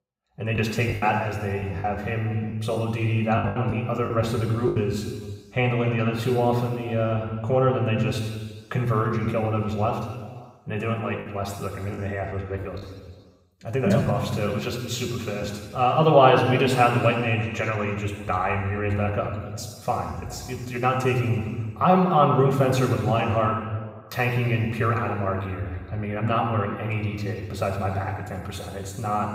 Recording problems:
off-mic speech; far
room echo; noticeable; dies away in 1.5 s
choppy; very; from 0.5 to 5 s and from 12 to 14 s; 9% of the speech affected

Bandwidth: 15.5 kHz